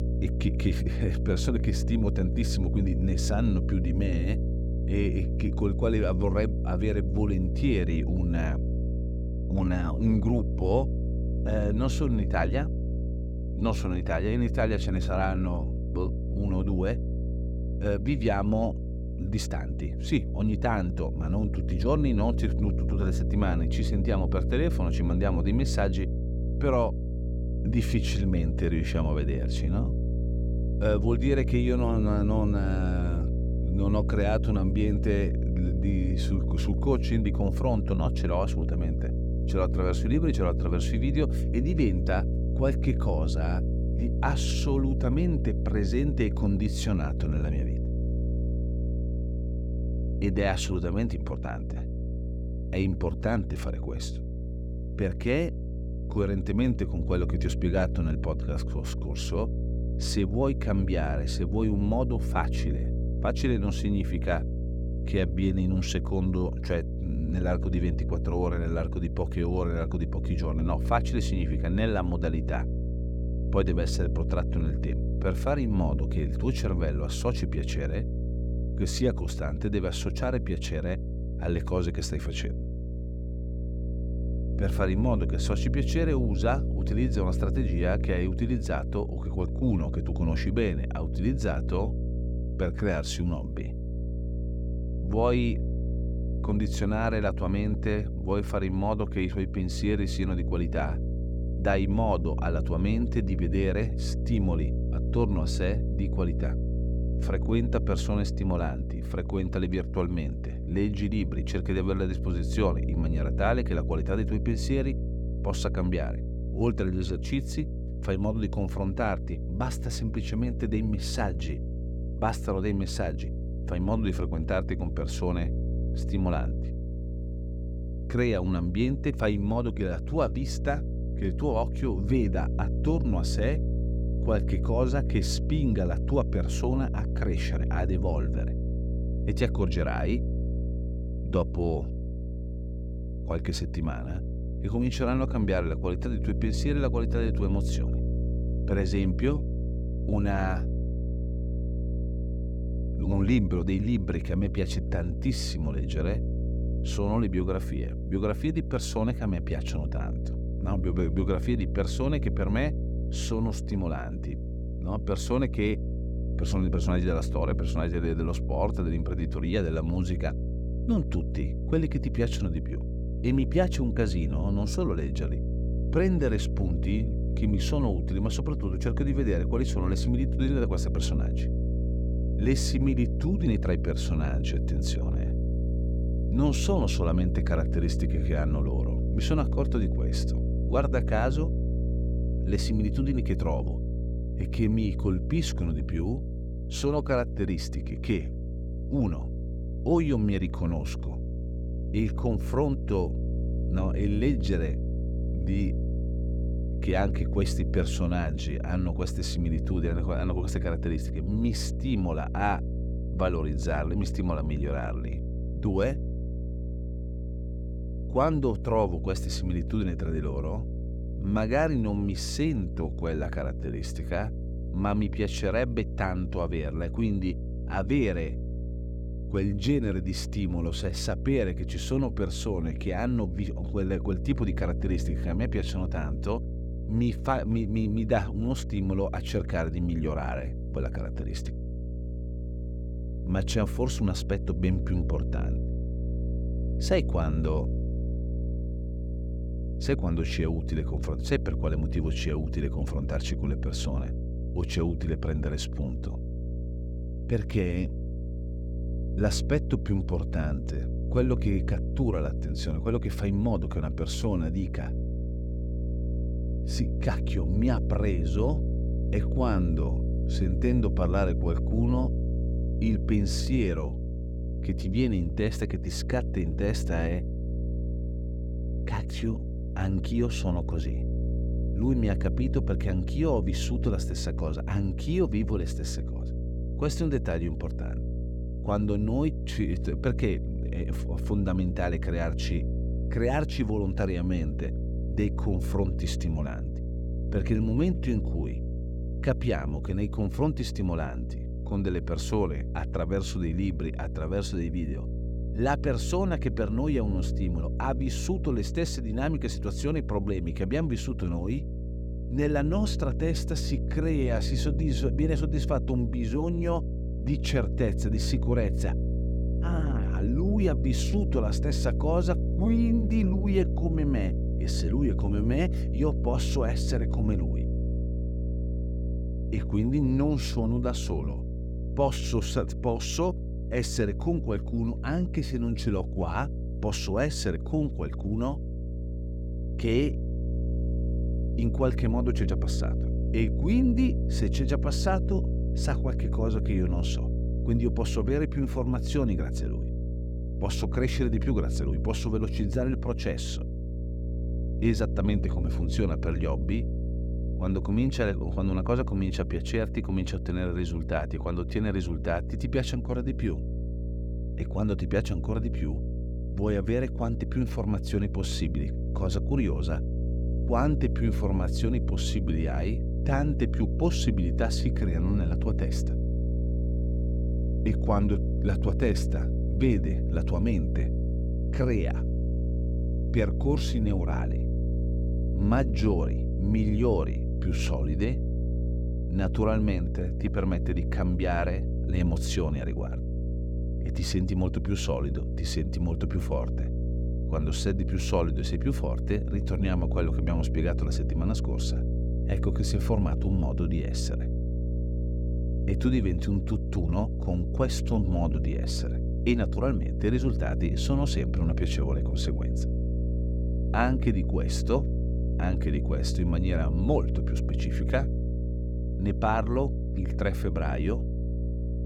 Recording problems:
electrical hum; loud; throughout; 60 Hz, 9 dB below the speech

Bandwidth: 18 kHz